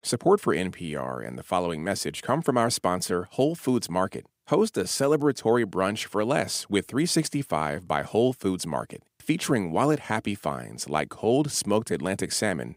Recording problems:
none

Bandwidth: 15.5 kHz